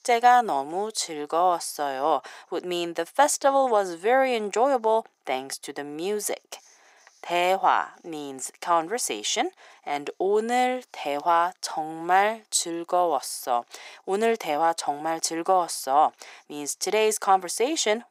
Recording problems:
thin; very; fading below 400 Hz

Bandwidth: 15.5 kHz